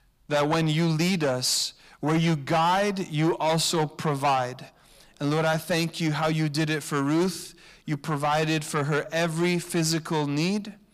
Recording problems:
distortion; heavy; 8 dB below the speech

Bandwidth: 15 kHz